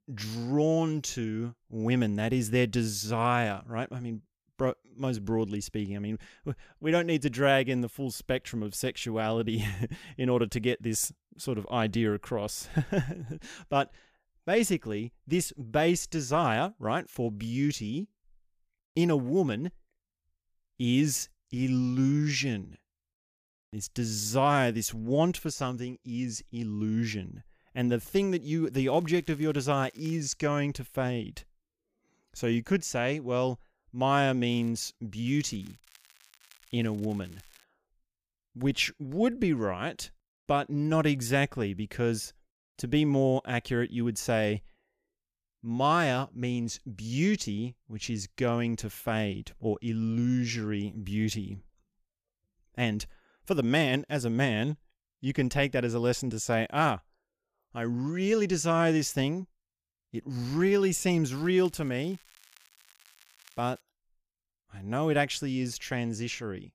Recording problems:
crackling; faint; 4 times, first at 29 s; 30 dB below the speech

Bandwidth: 15 kHz